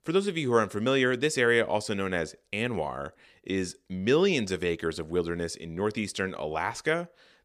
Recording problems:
none

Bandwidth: 15 kHz